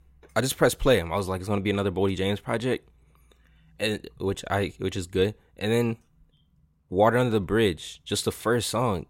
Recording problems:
none

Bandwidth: 16 kHz